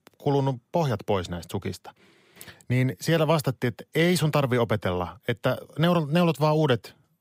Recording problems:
none

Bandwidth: 15.5 kHz